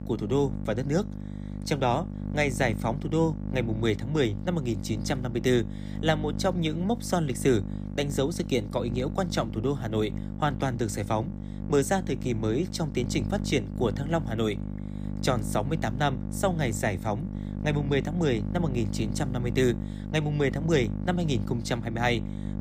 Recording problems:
electrical hum; noticeable; throughout; 50 Hz, 15 dB below the speech

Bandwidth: 14.5 kHz